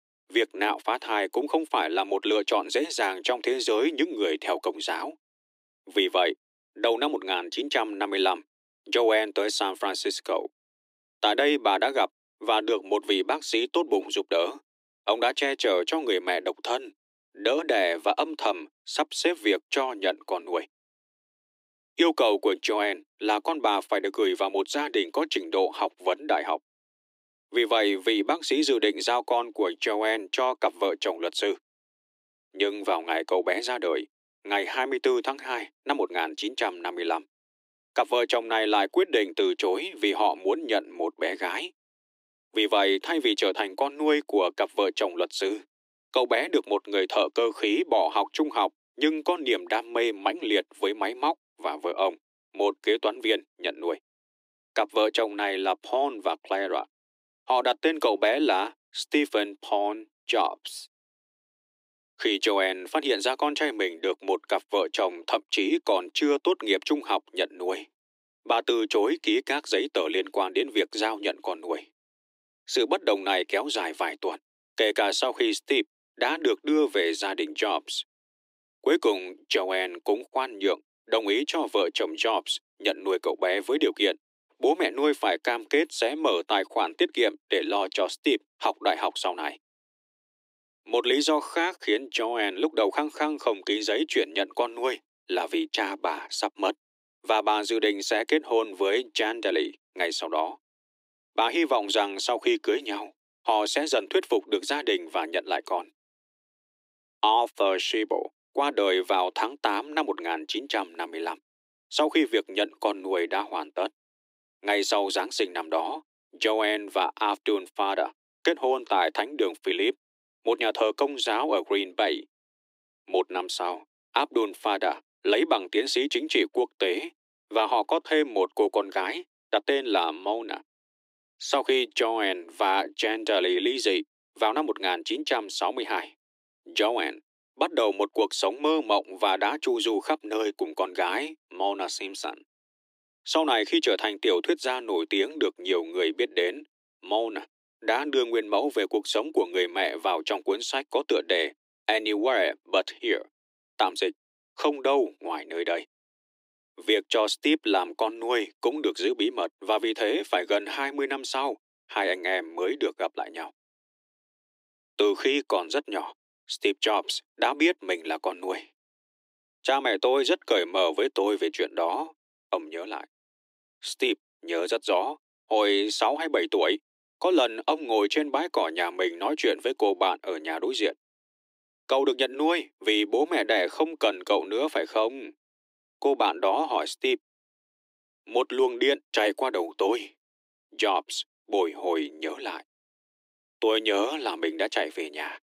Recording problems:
thin; very; fading below 300 Hz

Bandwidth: 15.5 kHz